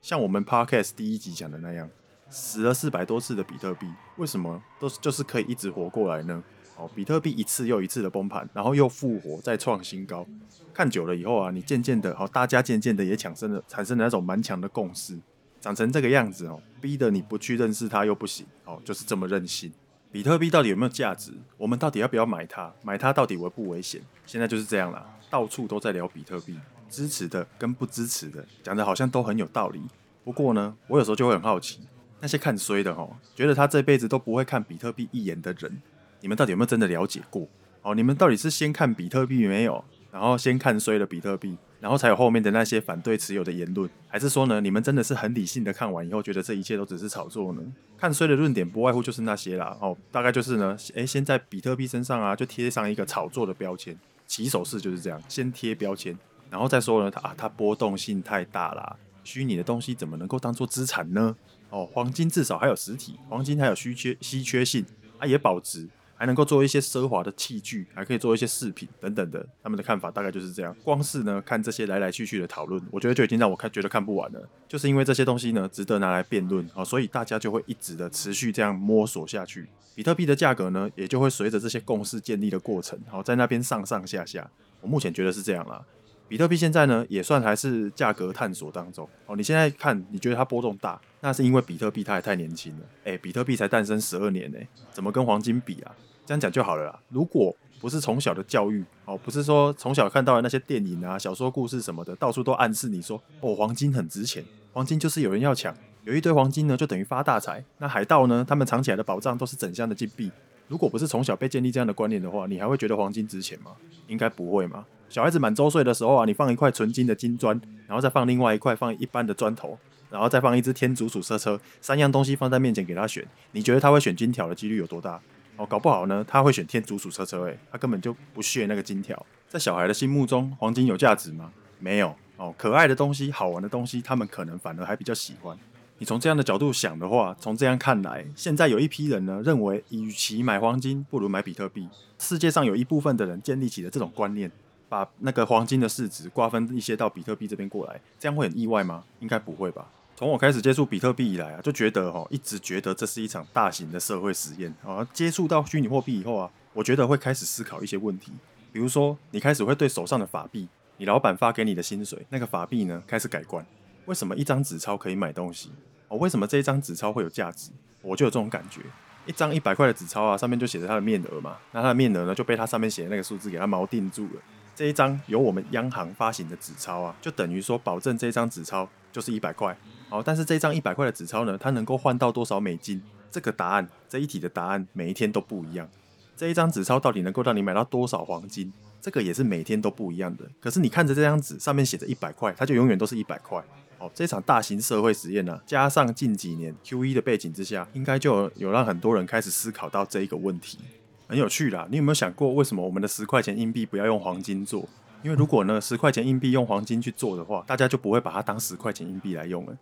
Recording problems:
chatter from many people; faint; throughout; 30 dB below the speech

